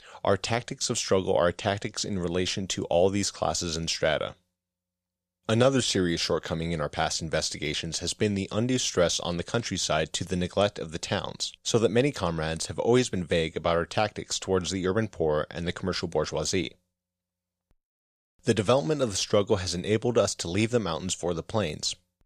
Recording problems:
none

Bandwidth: 14.5 kHz